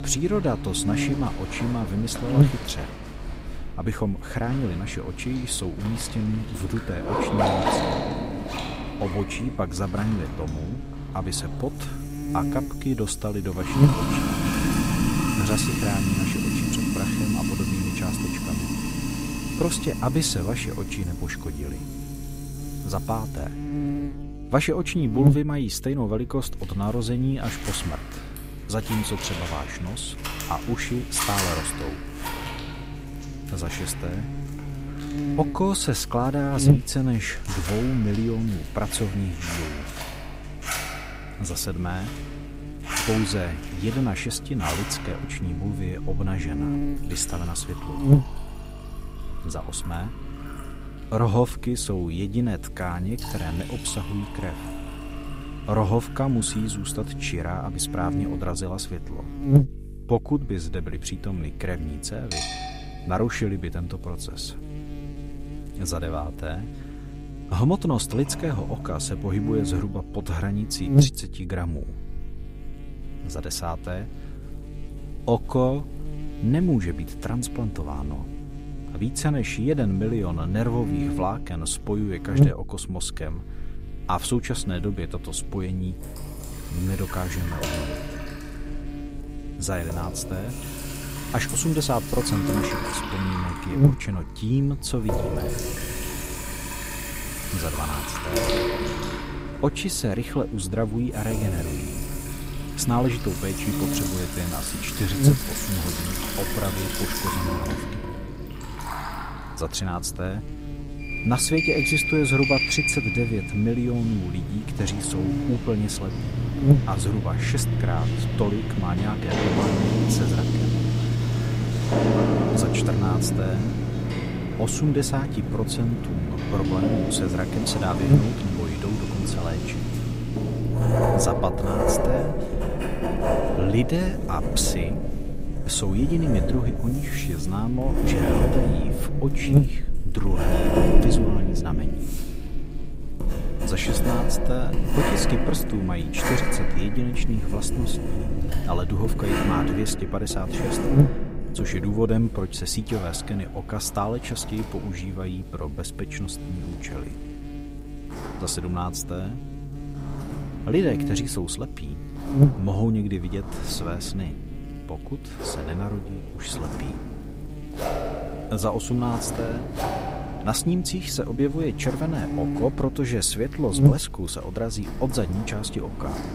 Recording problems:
electrical hum; loud; throughout; 50 Hz, 8 dB below the speech
household noises; loud; throughout; 1 dB below the speech

